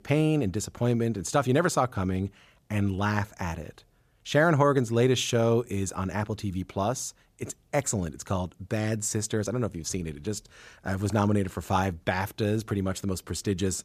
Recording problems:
none

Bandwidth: 14.5 kHz